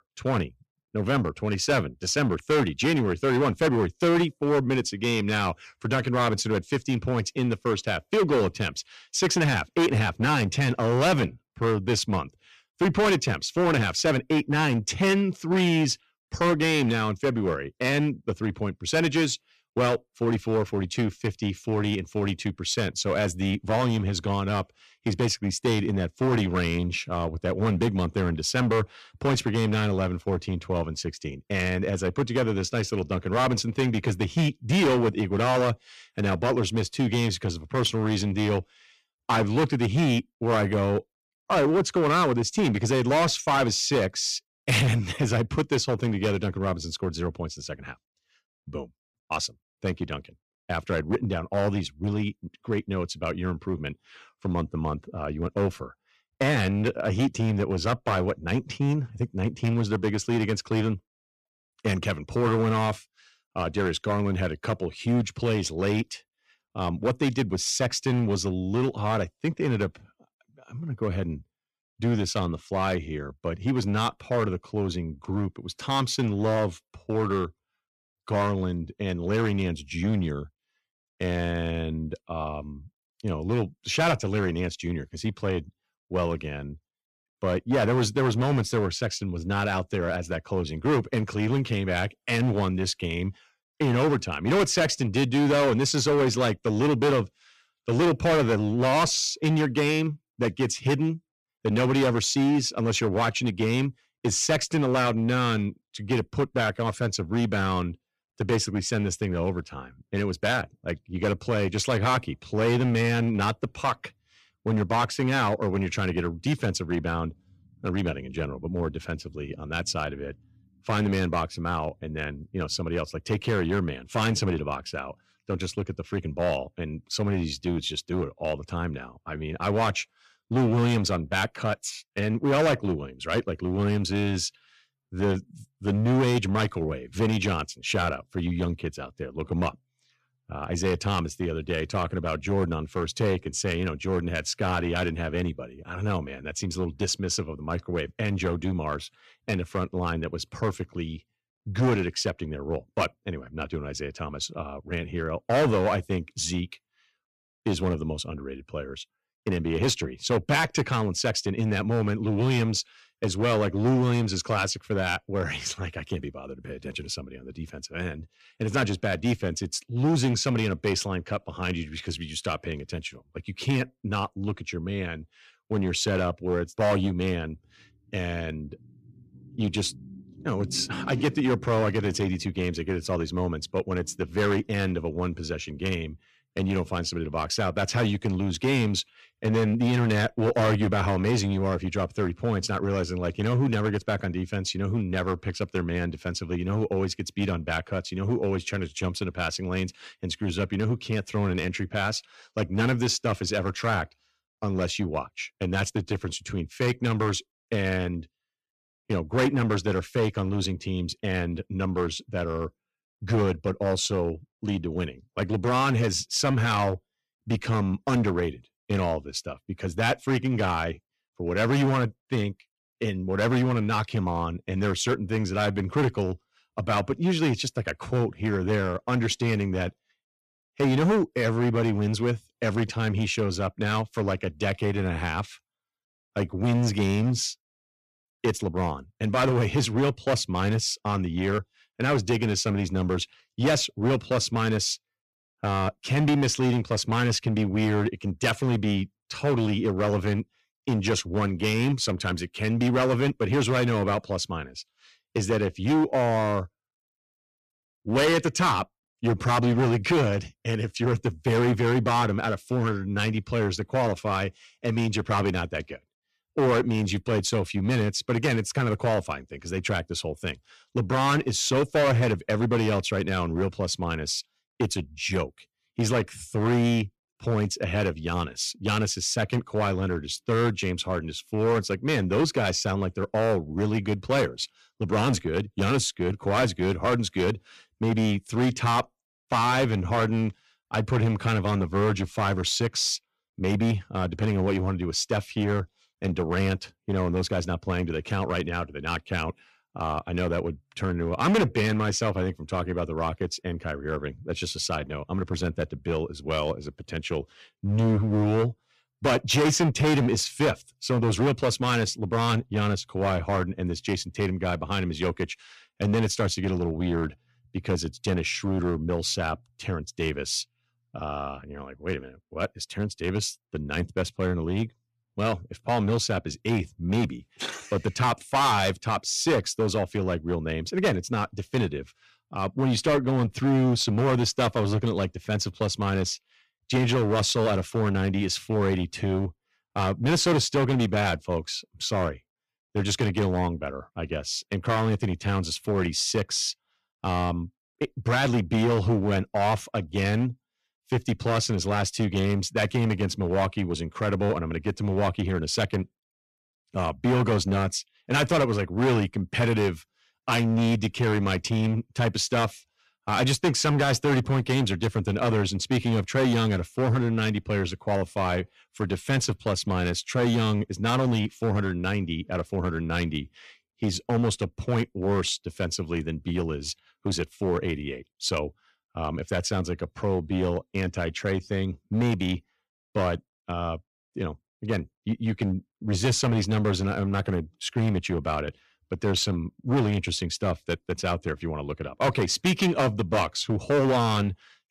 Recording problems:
distortion; heavy; 8% of the sound clipped

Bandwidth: 14.5 kHz